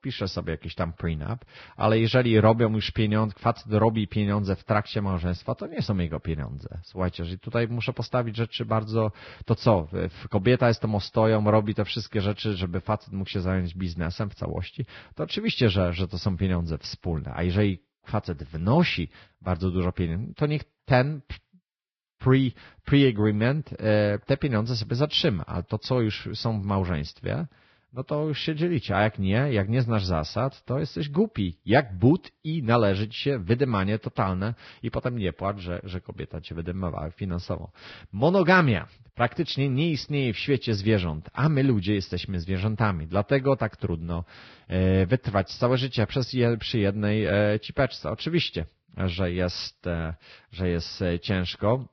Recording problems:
garbled, watery; badly; nothing above 5.5 kHz

